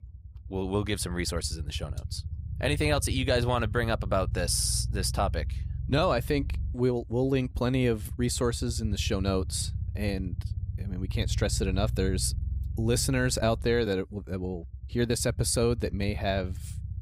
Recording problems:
low rumble; faint; throughout; 20 dB below the speech

